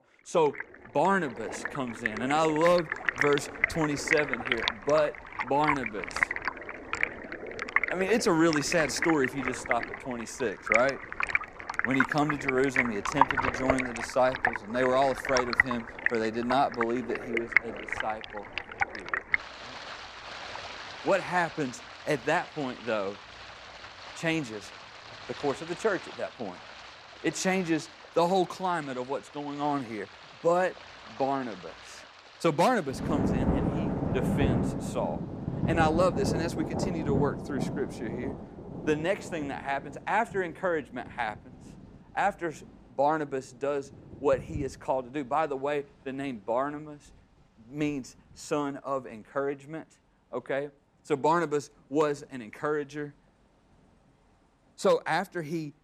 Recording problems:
rain or running water; loud; throughout; 2 dB below the speech

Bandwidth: 15 kHz